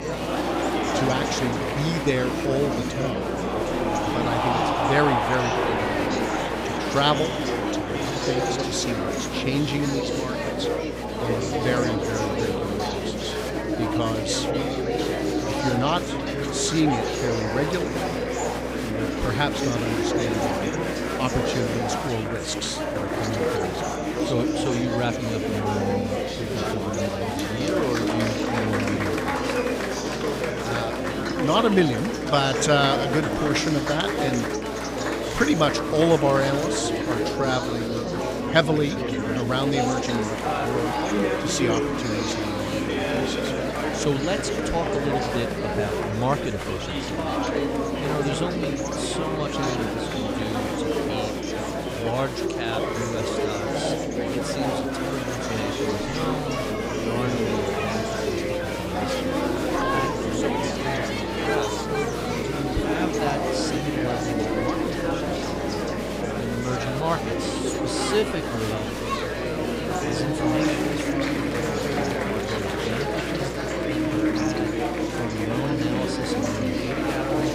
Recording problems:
echo of what is said; faint; from 33 s on; 350 ms later, 20 dB below the speech
chatter from many people; very loud; throughout; 2 dB above the speech
electrical hum; noticeable; throughout; 60 Hz, 10 dB below the speech

